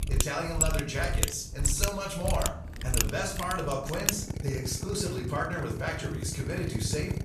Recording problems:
off-mic speech; far
room echo; slight; dies away in 0.6 s
machinery noise; very loud; throughout; as loud as the speech

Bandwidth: 14 kHz